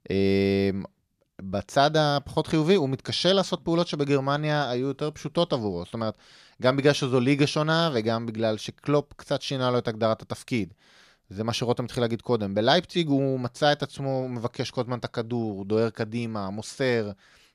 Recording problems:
none

